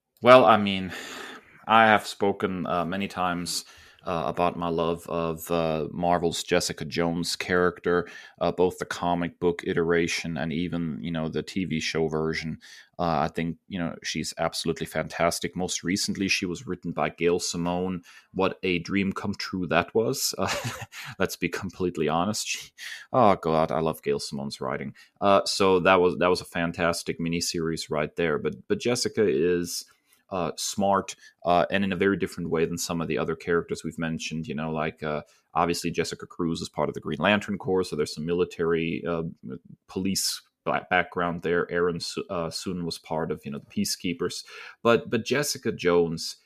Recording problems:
none

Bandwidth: 14.5 kHz